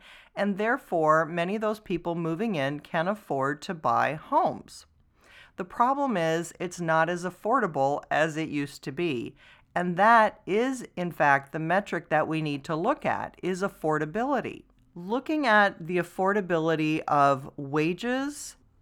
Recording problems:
muffled; very slightly; fading above 3 kHz

